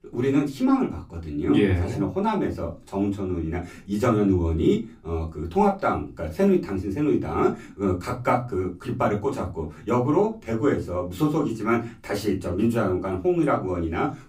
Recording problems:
off-mic speech; far
room echo; very slight; dies away in 0.2 s

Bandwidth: 15.5 kHz